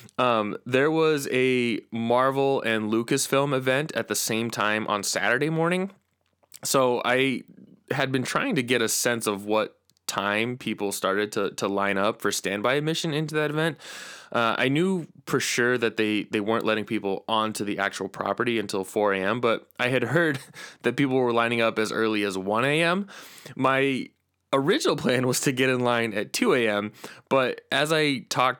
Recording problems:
none

